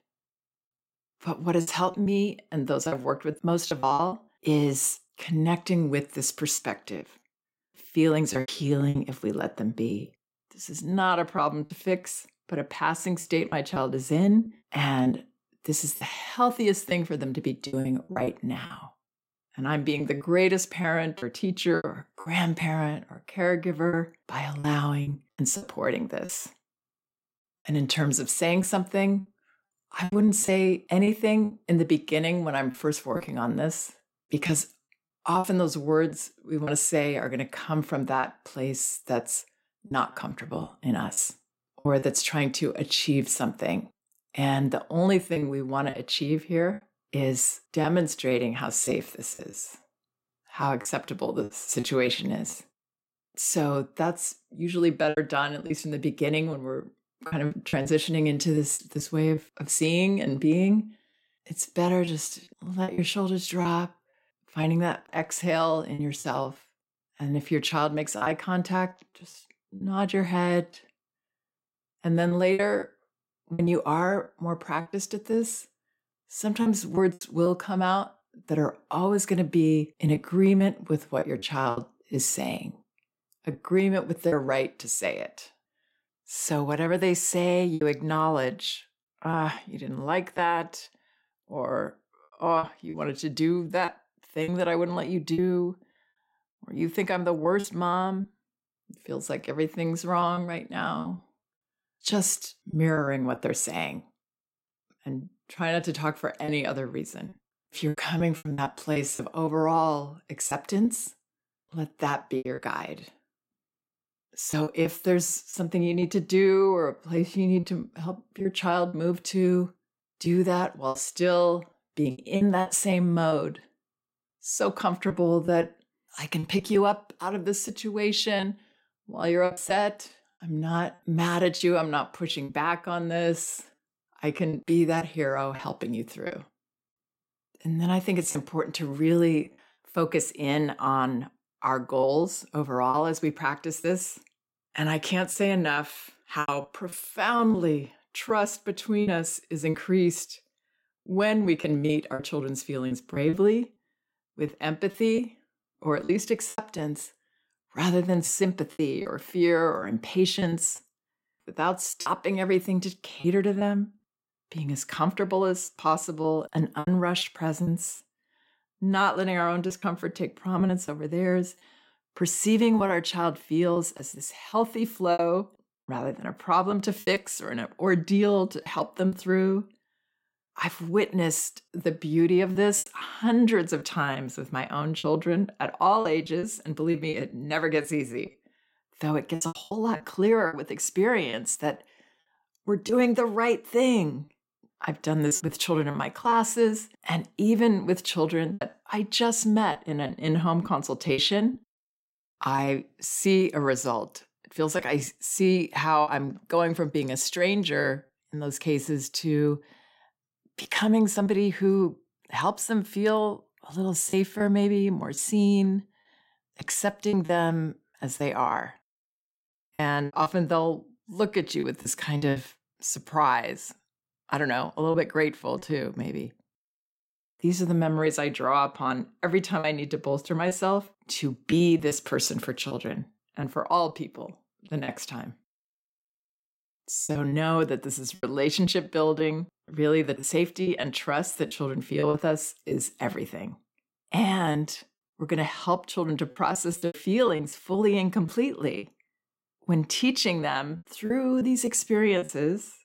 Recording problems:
choppy; very; 7% of the speech affected

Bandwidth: 16 kHz